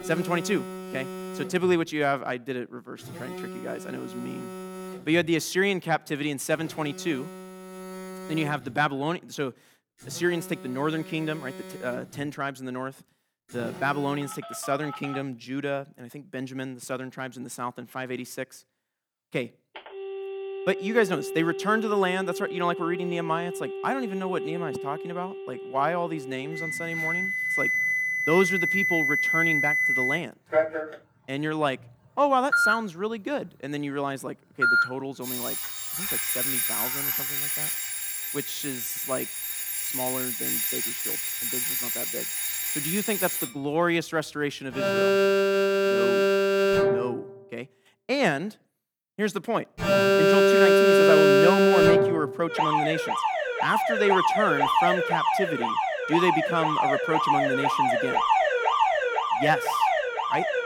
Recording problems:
alarms or sirens; very loud; throughout; 5 dB above the speech

